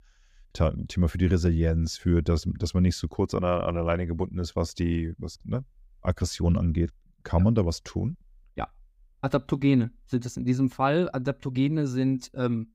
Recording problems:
none

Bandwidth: 15.5 kHz